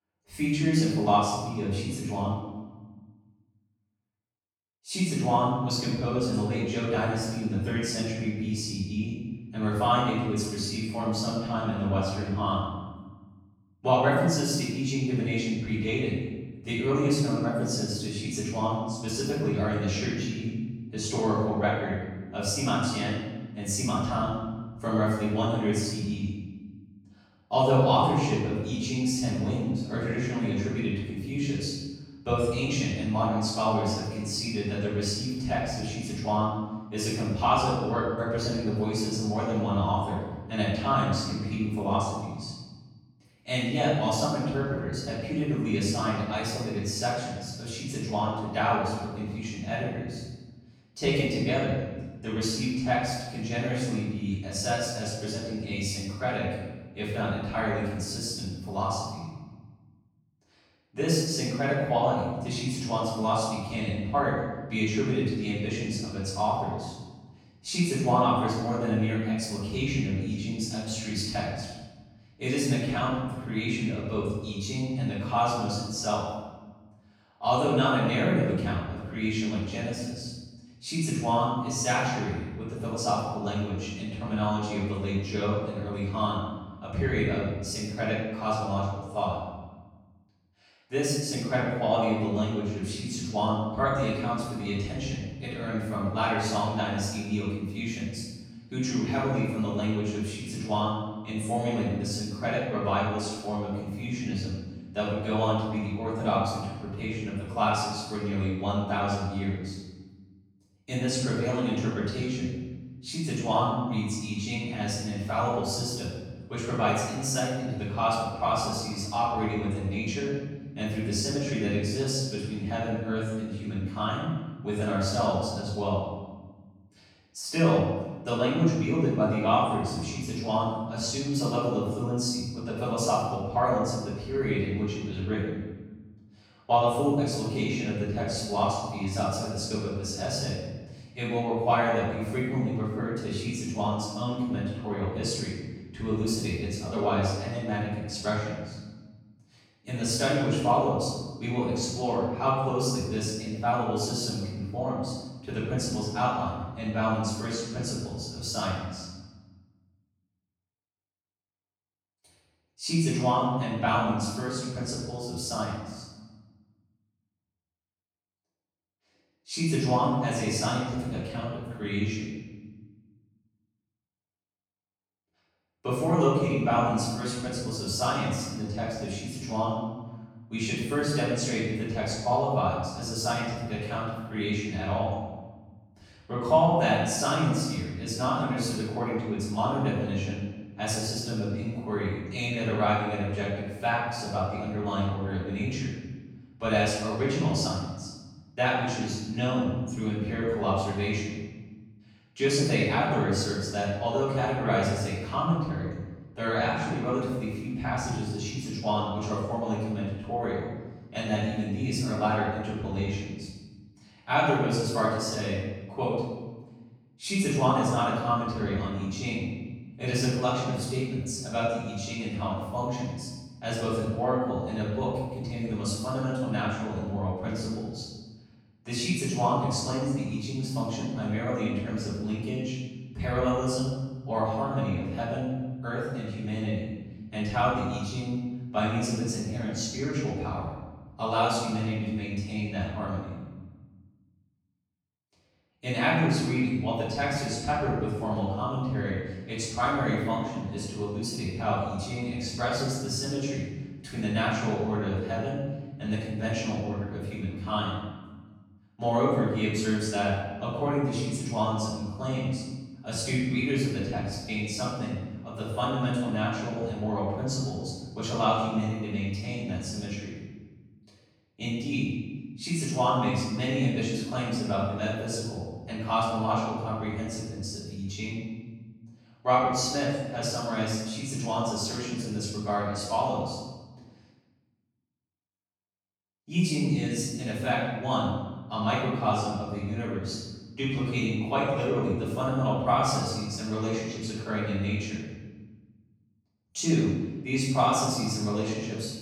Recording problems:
room echo; strong; dies away in 1.1 s
off-mic speech; far

